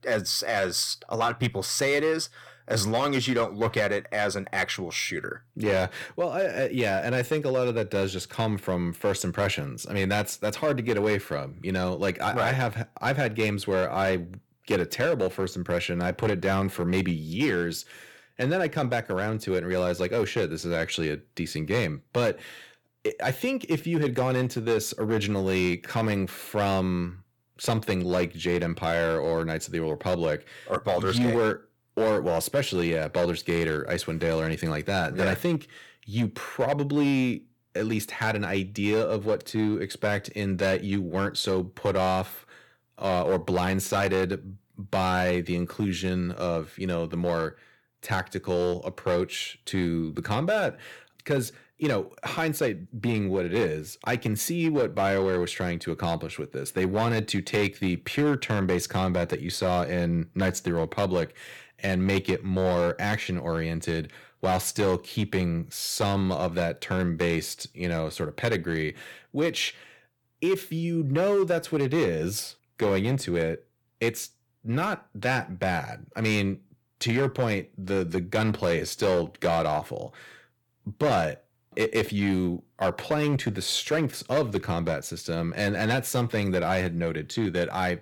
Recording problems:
distortion; slight; 5% of the sound clipped

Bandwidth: 18.5 kHz